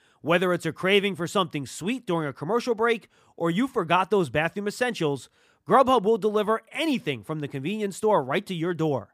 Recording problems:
none

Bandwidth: 15 kHz